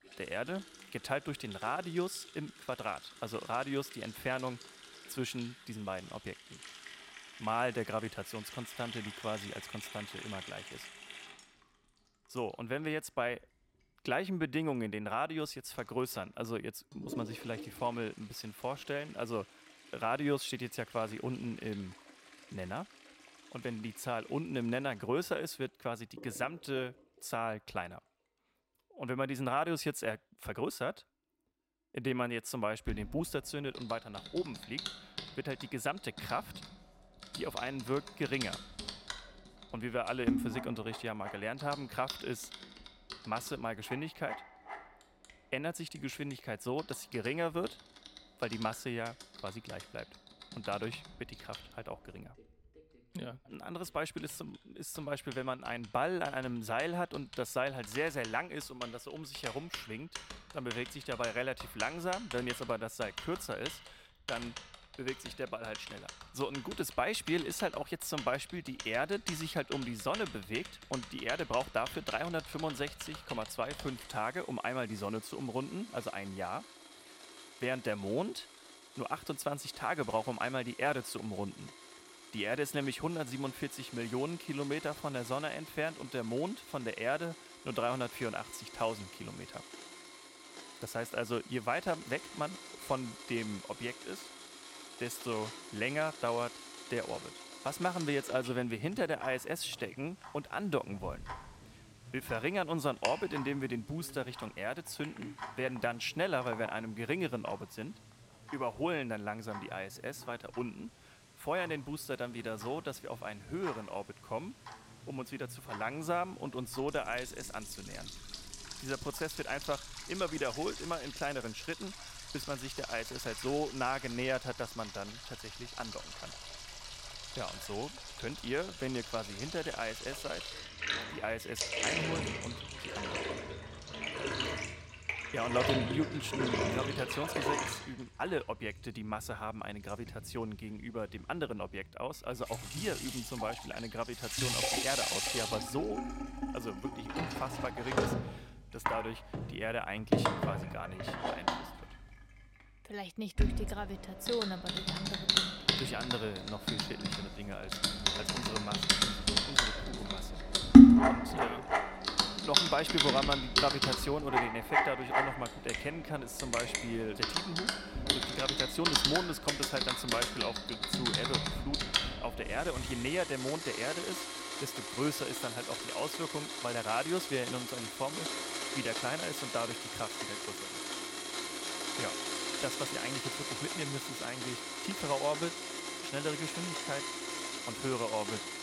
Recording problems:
household noises; very loud; throughout; 3 dB above the speech

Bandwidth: 16 kHz